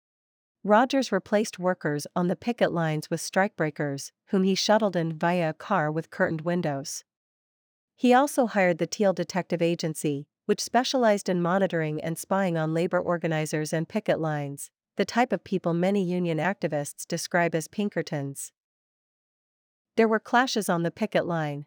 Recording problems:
none

